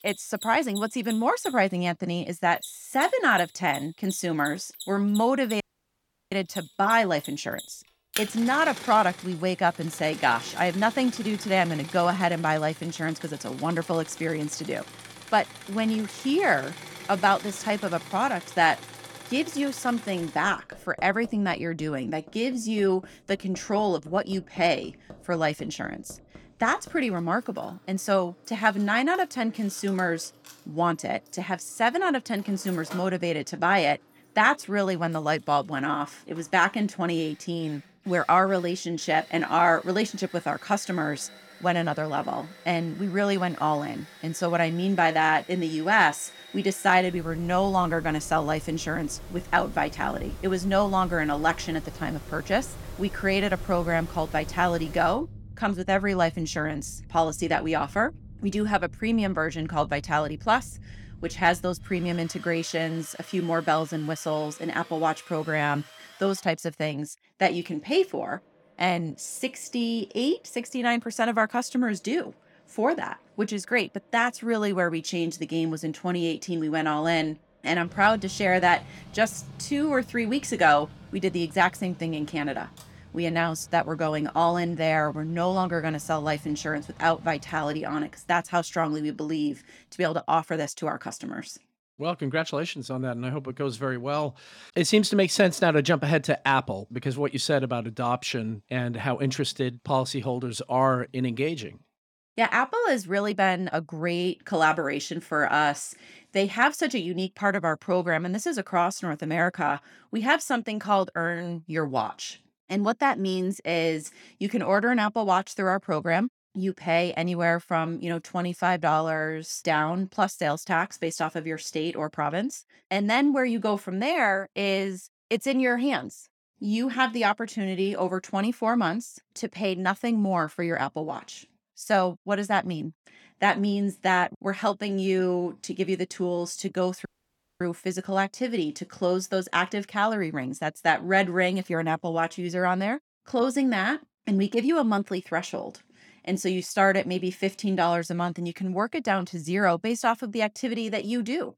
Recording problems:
machinery noise; noticeable; until 1:30; 15 dB below the speech
audio cutting out; at 5.5 s for 0.5 s and at 2:17 for 0.5 s

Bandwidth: 18 kHz